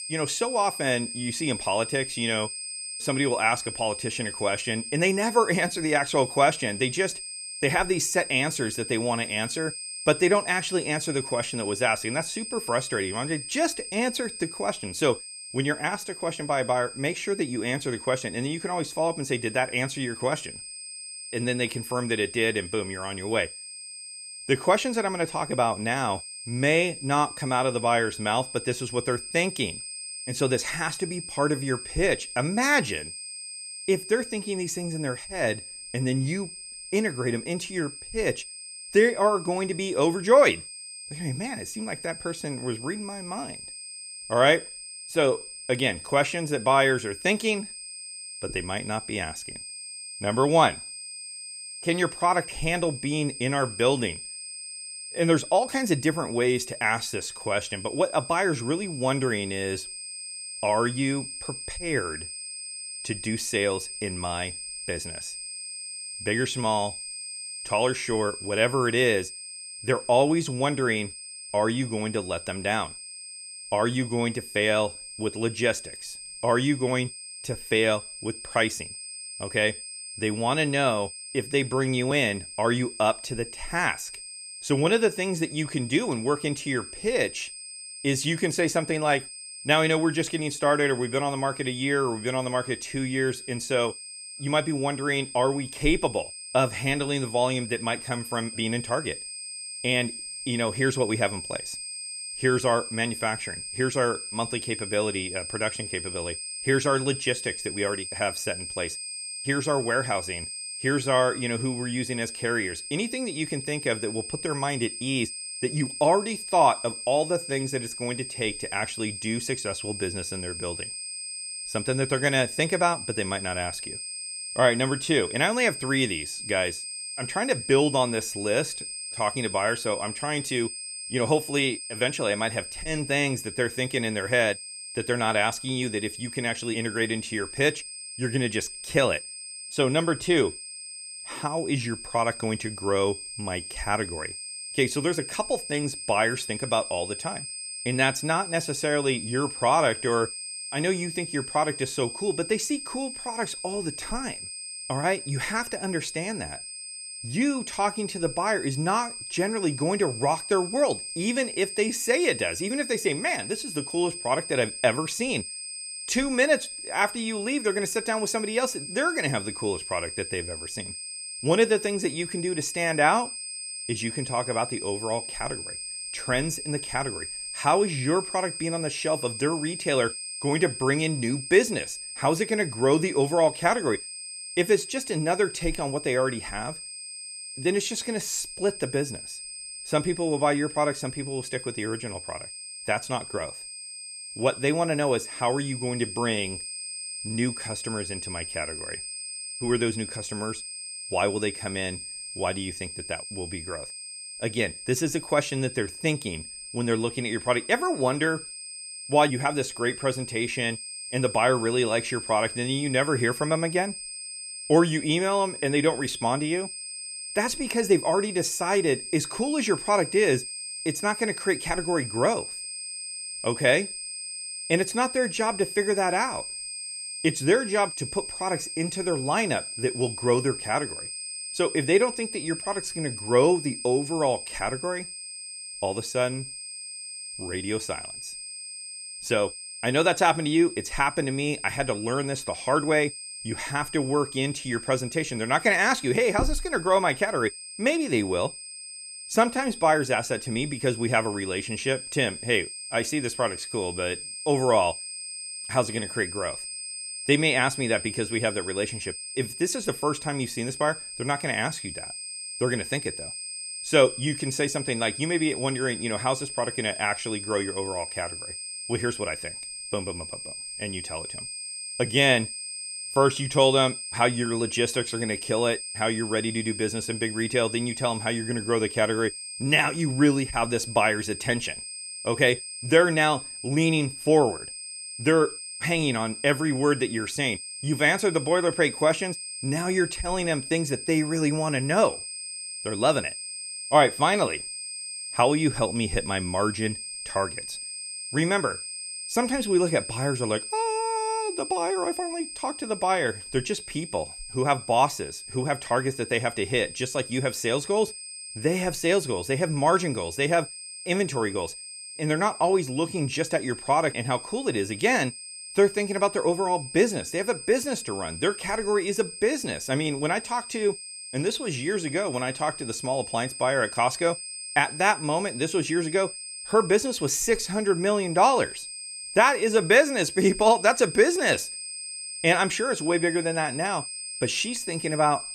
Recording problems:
high-pitched whine; loud; throughout; 8.5 kHz, 9 dB below the speech

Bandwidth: 15 kHz